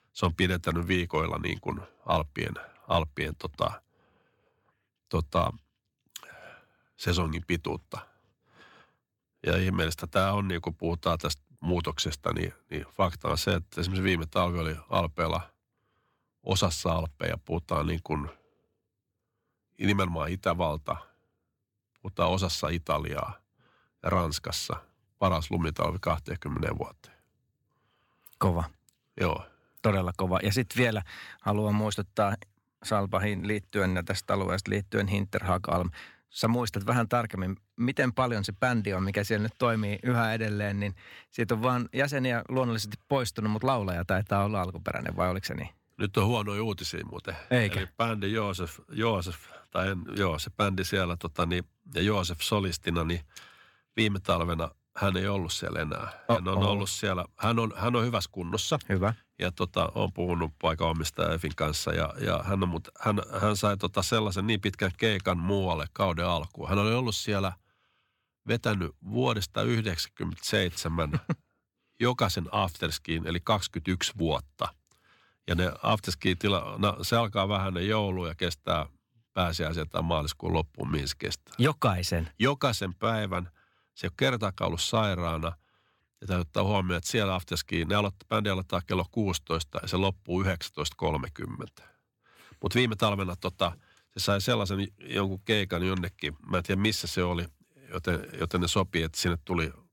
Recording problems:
none

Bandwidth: 17 kHz